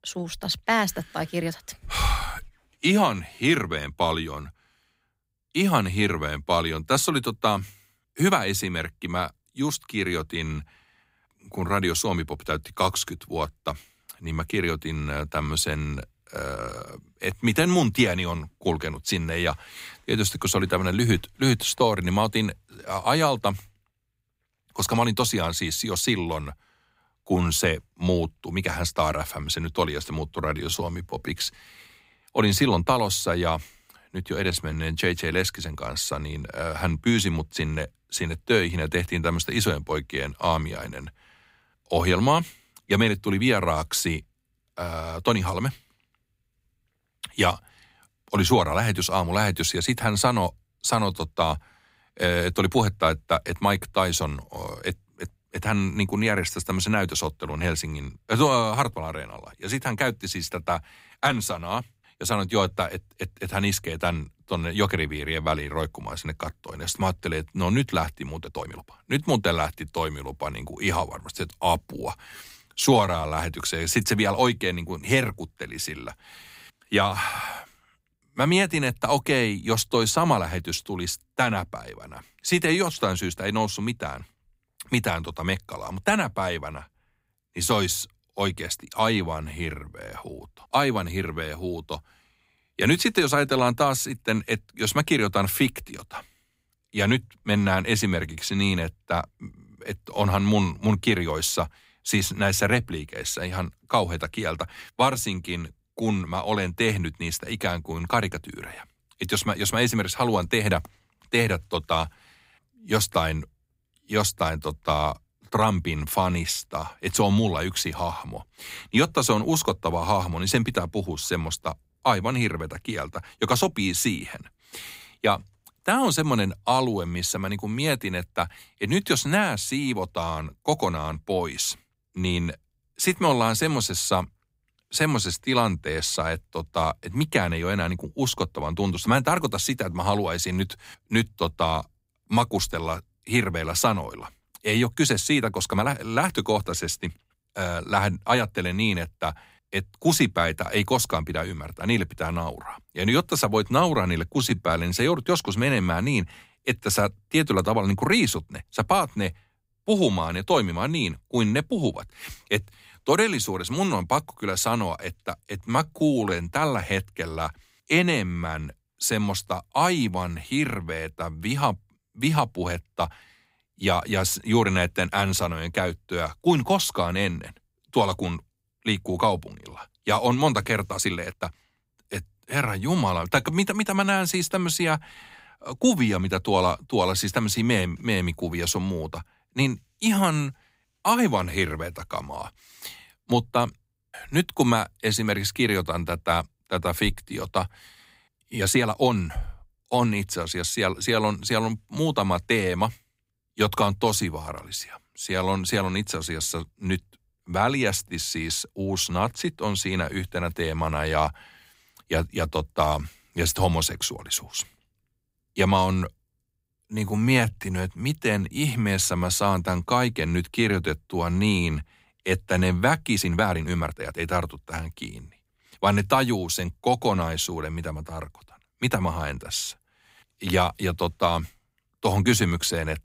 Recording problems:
uneven, jittery; strongly; from 30 s to 3:44

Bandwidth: 15.5 kHz